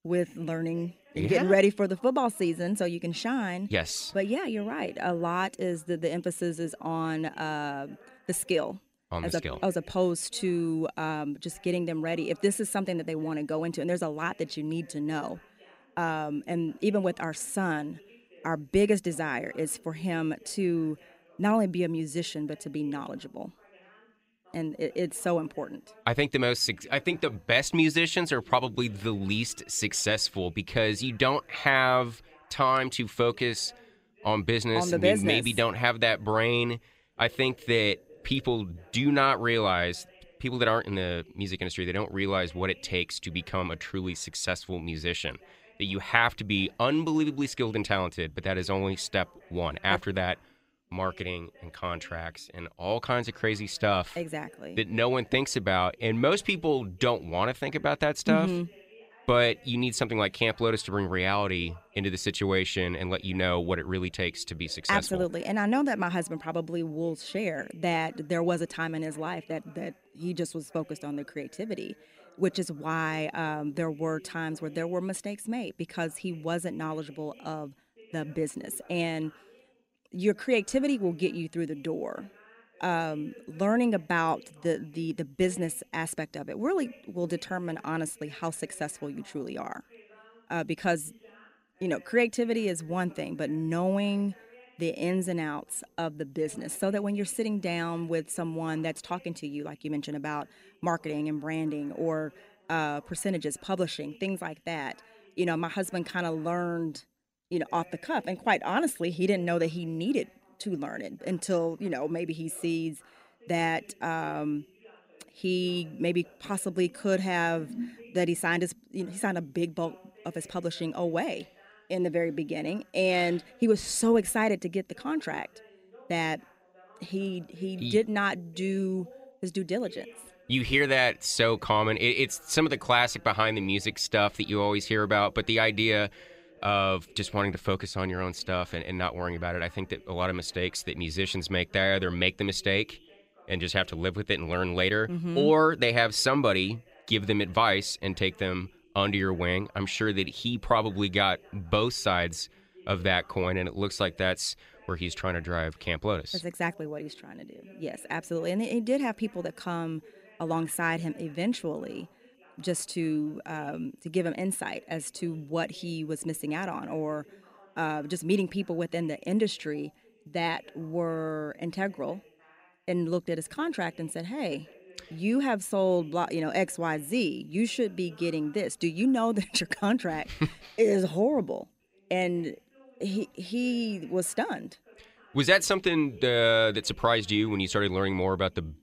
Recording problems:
voice in the background; faint; throughout; 25 dB below the speech

